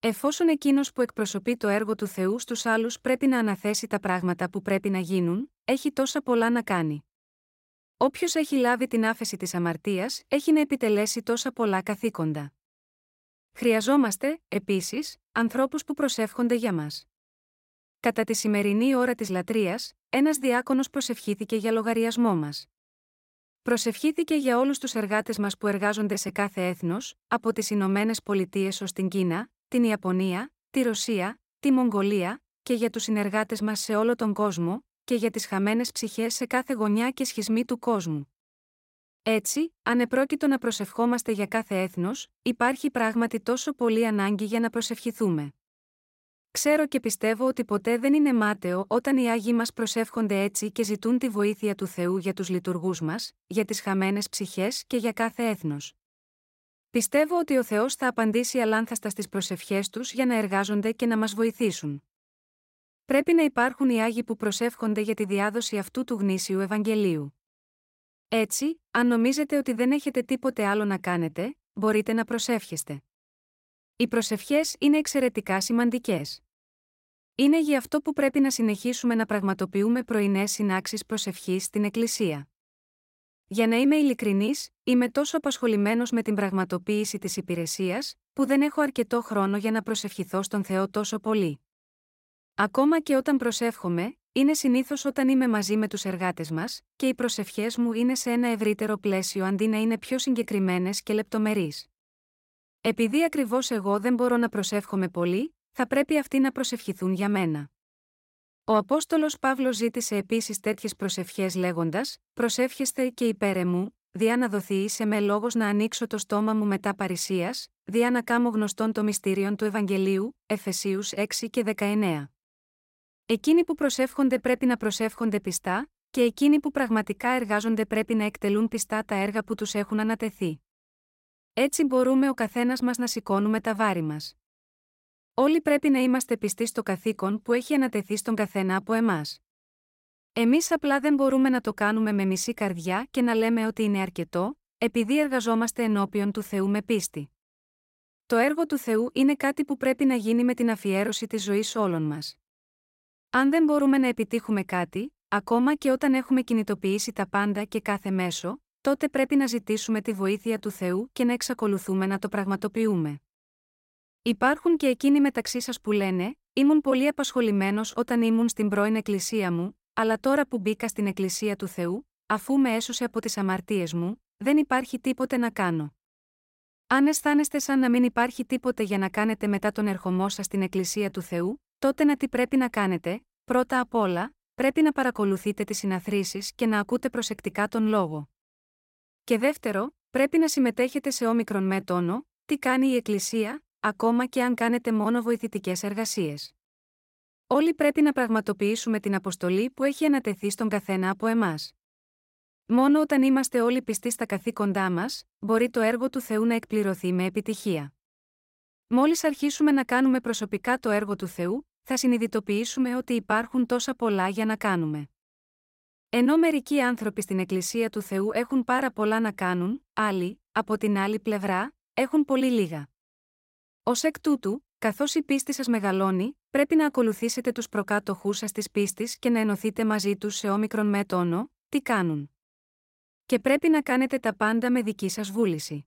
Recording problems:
none

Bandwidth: 16 kHz